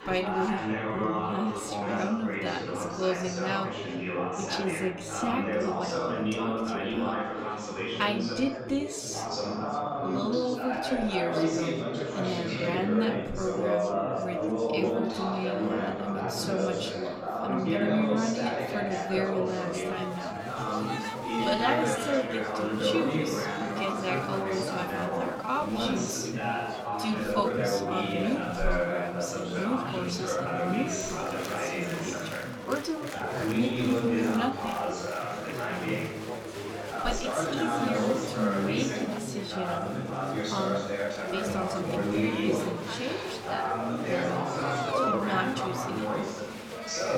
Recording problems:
wrong speed, natural pitch; too slow; 0.7 times normal speed
room echo; slight; dies away in 0.3 s
off-mic speech; somewhat distant
chatter from many people; very loud; throughout; 2 dB above the speech
uneven, jittery; strongly; from 1 to 46 s

